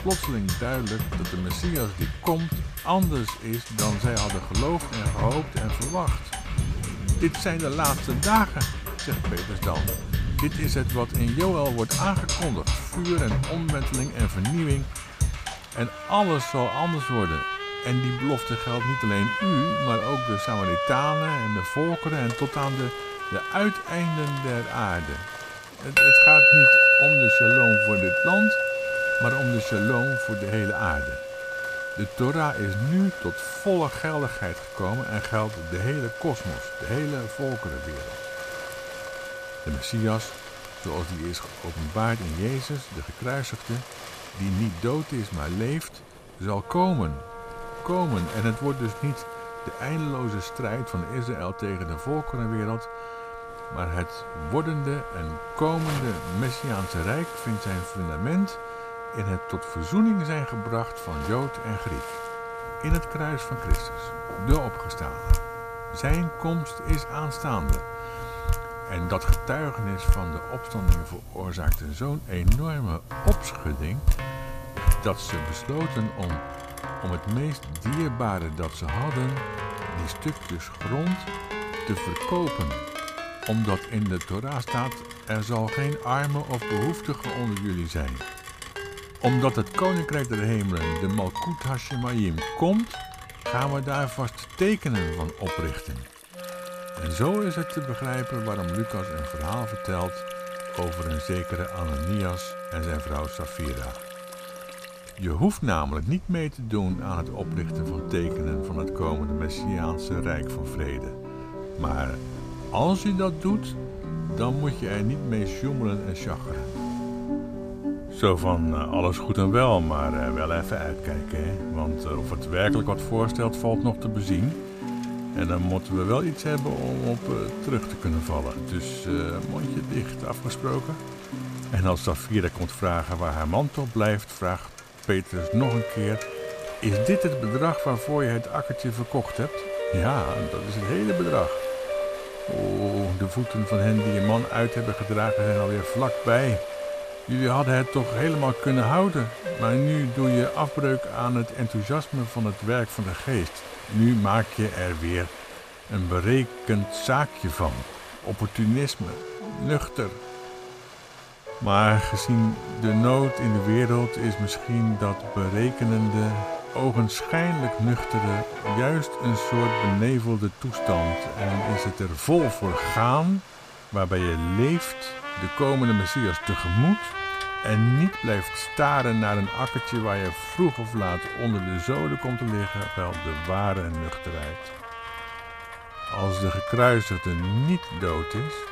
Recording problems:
background music; loud; throughout; 2 dB below the speech
rain or running water; noticeable; throughout; 10 dB below the speech

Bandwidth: 14.5 kHz